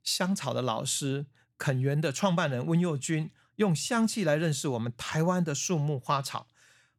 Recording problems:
none

